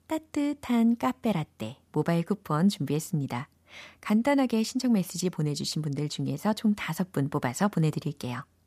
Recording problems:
none

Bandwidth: 14.5 kHz